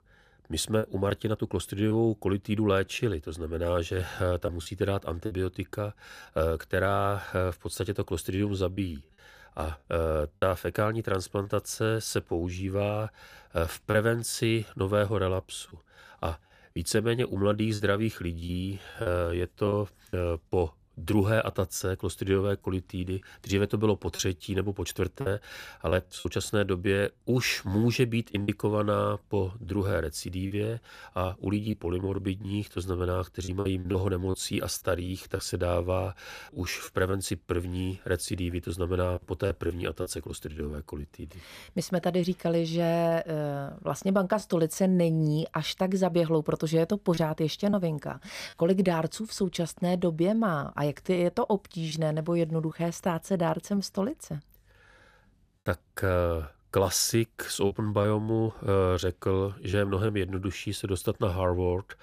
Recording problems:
choppy; occasionally; 4% of the speech affected

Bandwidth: 15 kHz